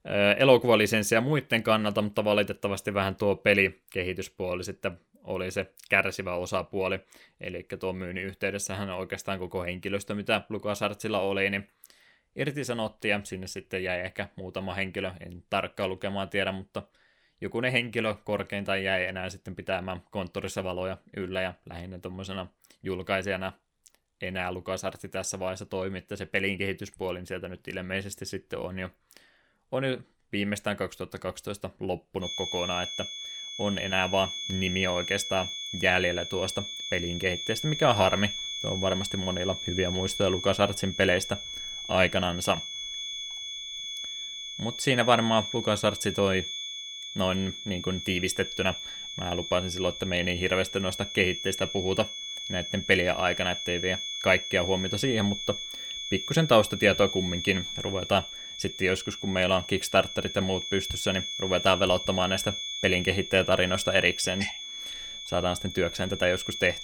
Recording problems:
high-pitched whine; loud; from 32 s on; 3.5 kHz, 6 dB below the speech

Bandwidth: 18.5 kHz